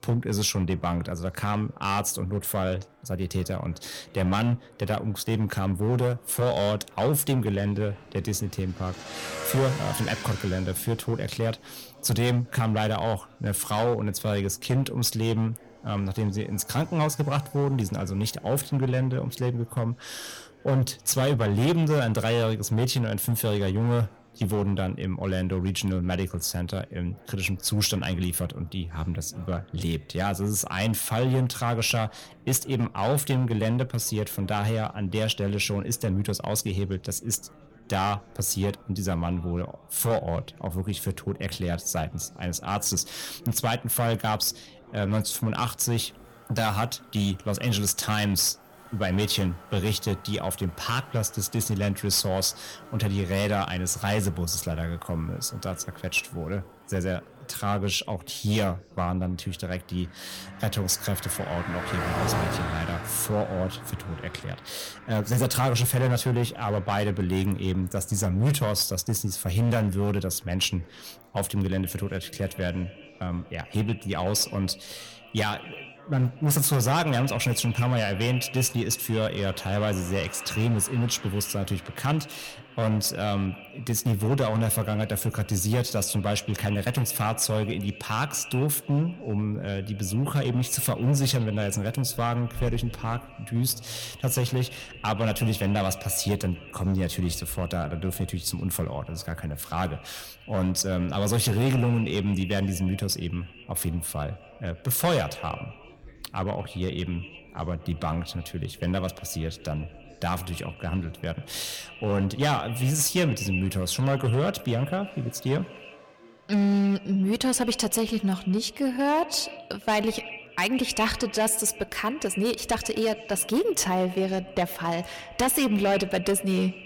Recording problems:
echo of what is said; noticeable; from 1:12 on; 110 ms later, 15 dB below the speech
distortion; slight; 5% of the sound clipped
traffic noise; noticeable; throughout; 15 dB below the speech
background chatter; faint; throughout; 4 voices, 25 dB below the speech

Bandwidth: 17 kHz